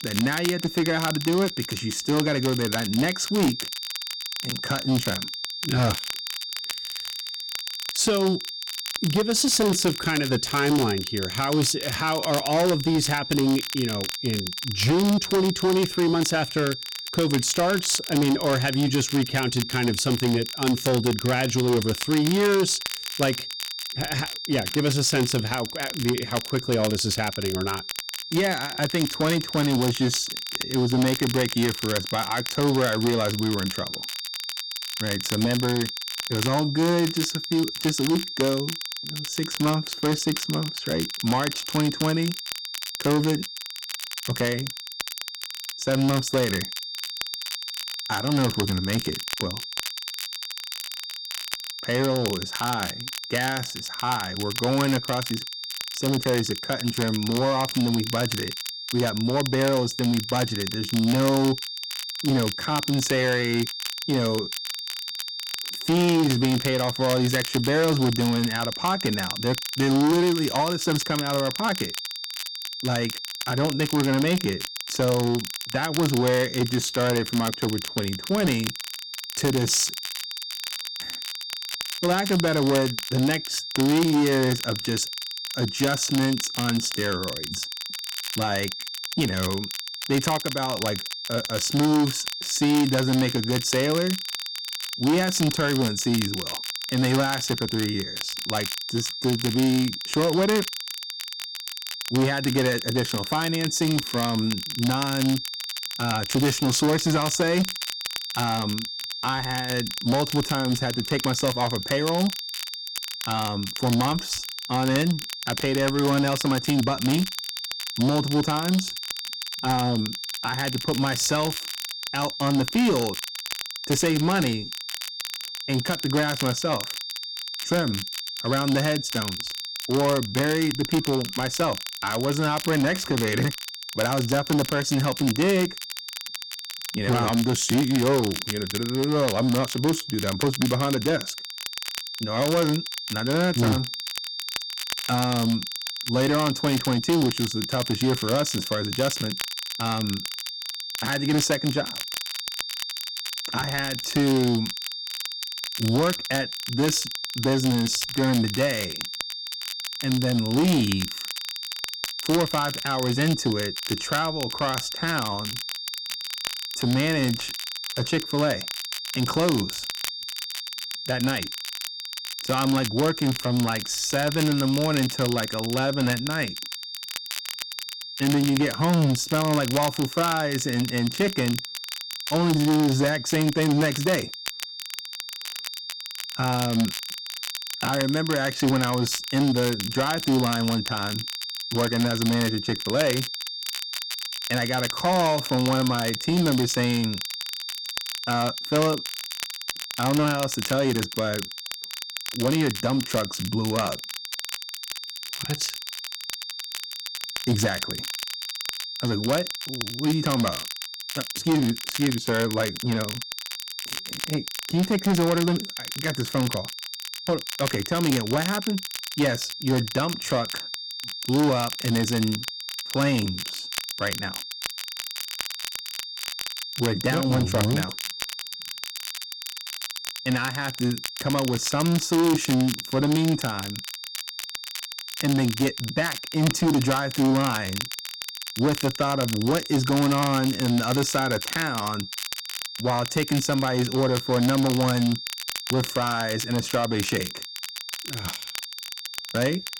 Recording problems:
distortion; slight; 7% of the sound clipped
high-pitched whine; loud; throughout; 4.5 kHz, 8 dB below the speech
crackle, like an old record; loud; 10 dB below the speech

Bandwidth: 17 kHz